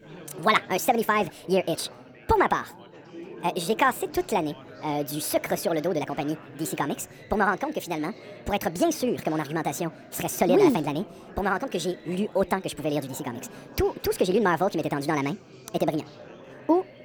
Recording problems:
wrong speed and pitch; too fast and too high; 1.5 times normal speed
chatter from many people; noticeable; throughout; 20 dB below the speech

